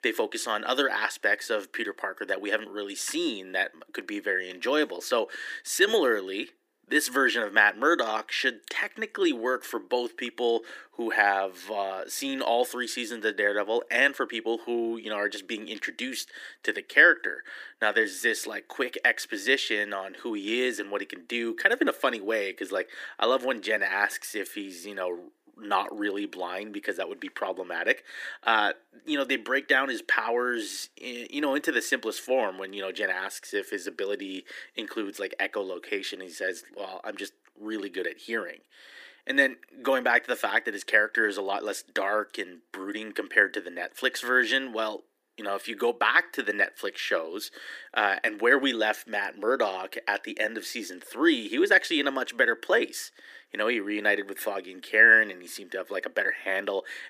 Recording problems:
thin; very; fading below 300 Hz

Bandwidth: 15 kHz